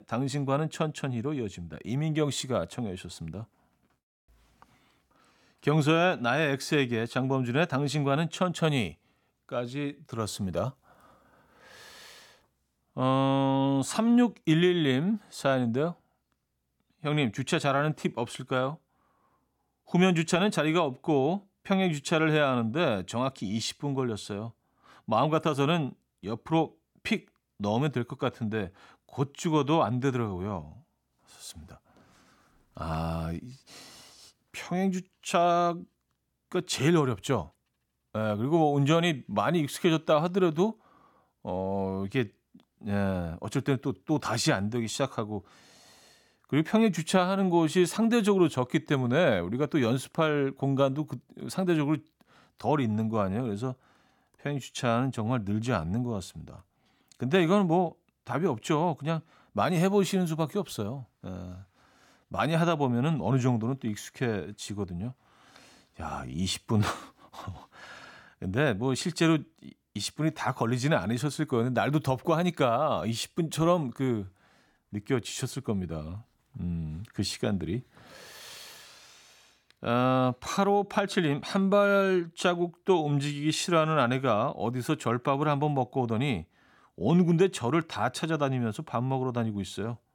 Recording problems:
none

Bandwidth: 17.5 kHz